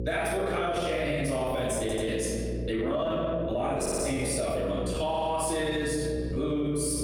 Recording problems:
off-mic speech; far
room echo; noticeable; dies away in 1.3 s
squashed, flat; somewhat
electrical hum; noticeable; throughout; 60 Hz, 15 dB below the speech
uneven, jittery; strongly; from 0.5 to 6.5 s
audio stuttering; at 2 s, at 4 s and at 5 s

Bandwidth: 18 kHz